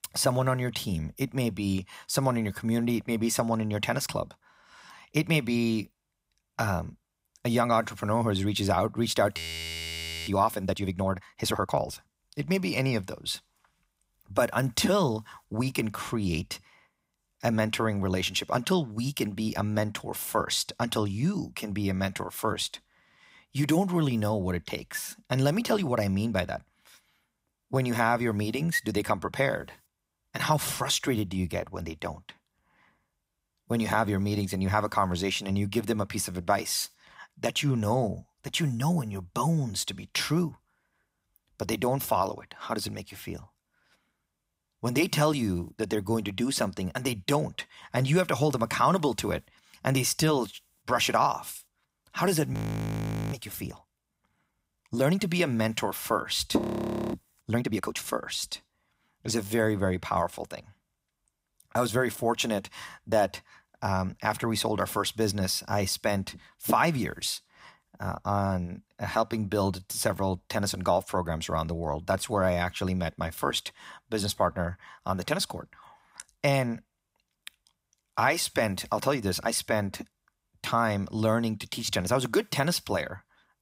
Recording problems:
audio freezing; at 9.5 s for 1 s, at 53 s for 1 s and at 57 s for 0.5 s

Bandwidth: 15.5 kHz